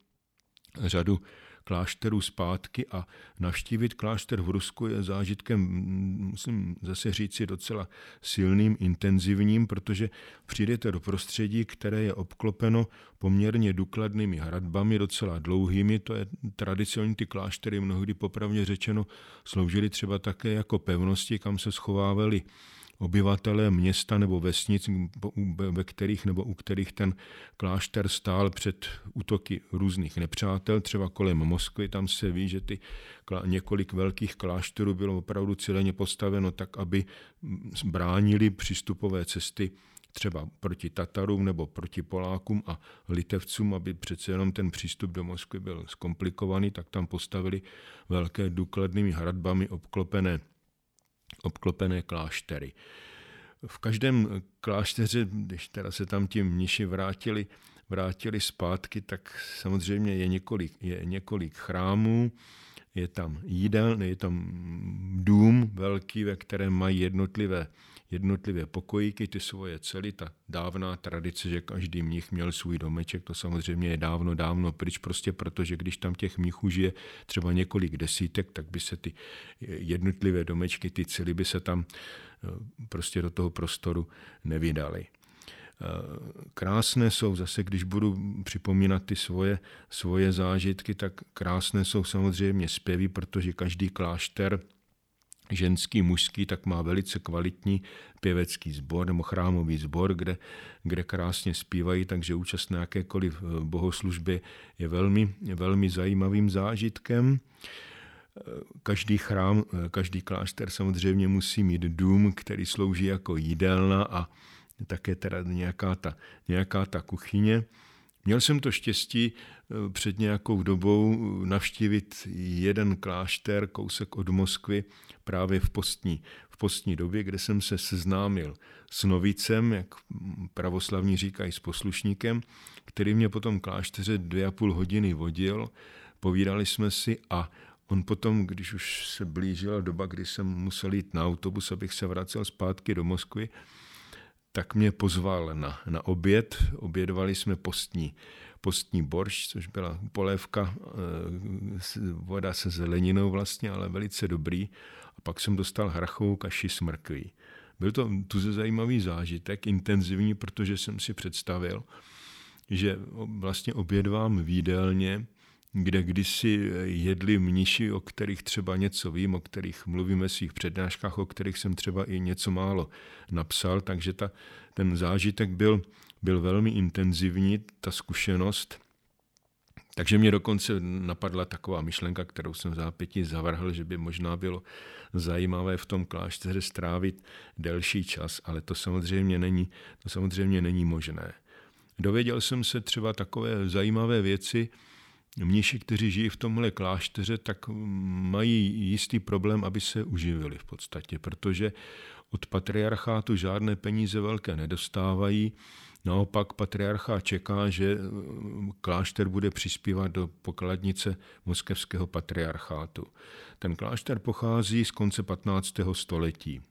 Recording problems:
none

